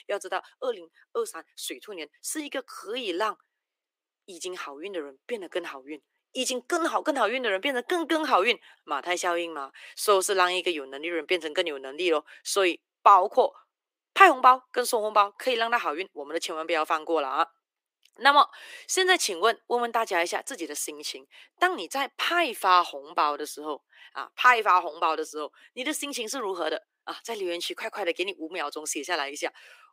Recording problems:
thin; very; fading below 300 Hz

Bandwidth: 15.5 kHz